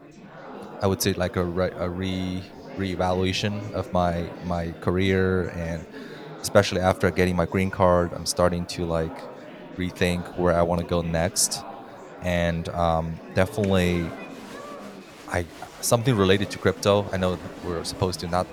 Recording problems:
murmuring crowd; noticeable; throughout; 15 dB below the speech

